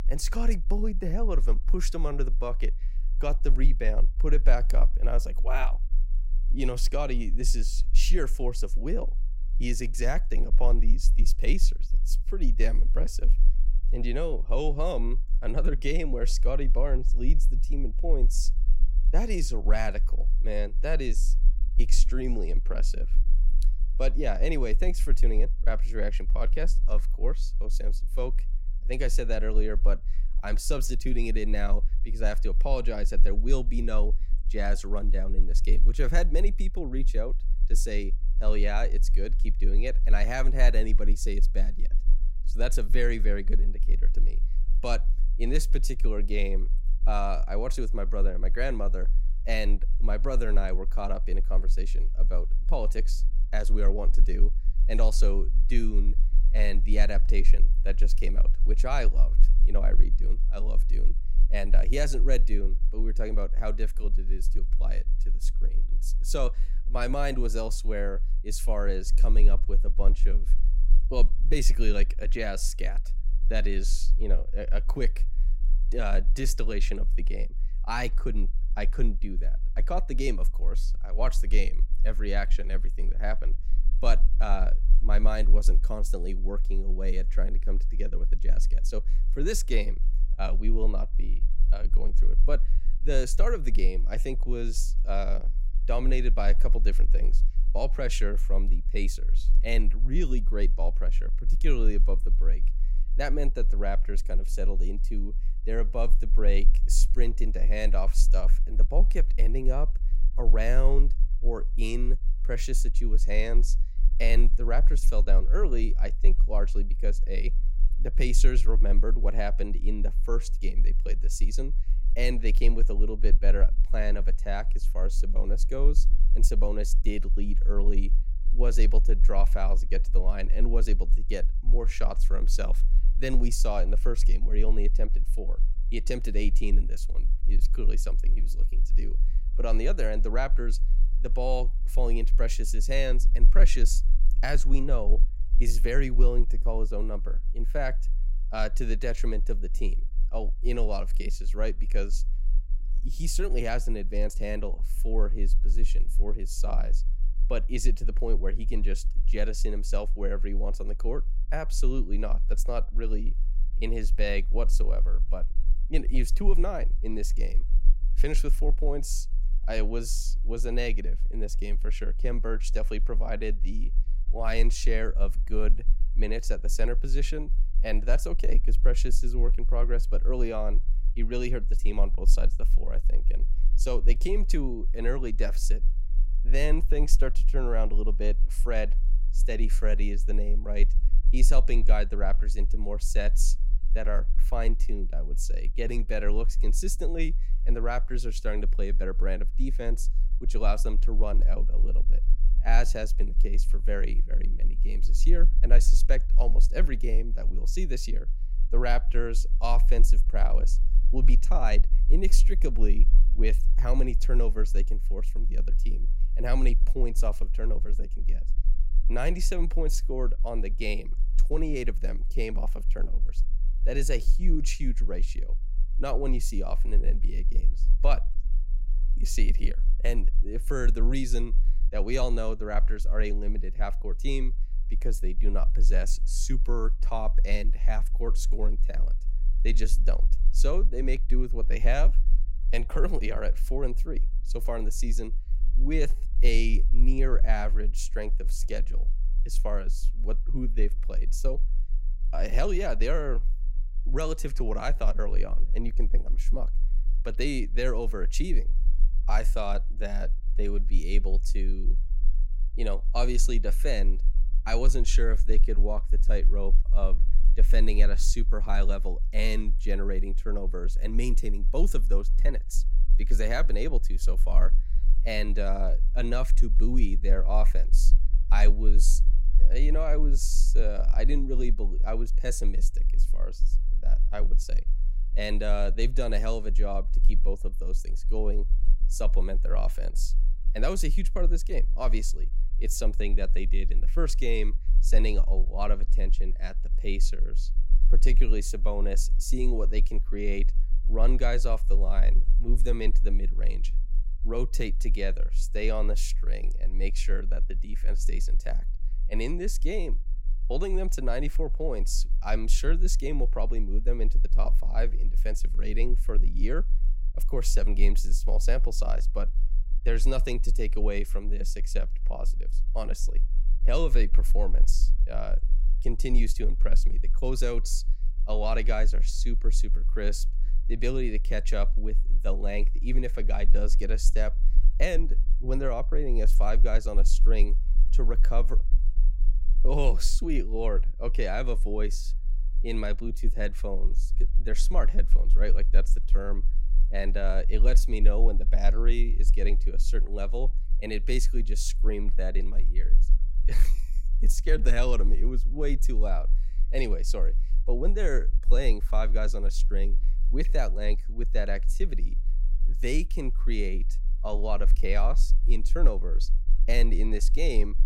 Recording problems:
low rumble; faint; throughout; 20 dB below the speech

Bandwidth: 16 kHz